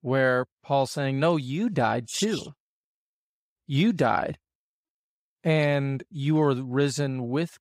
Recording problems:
none

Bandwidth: 15.5 kHz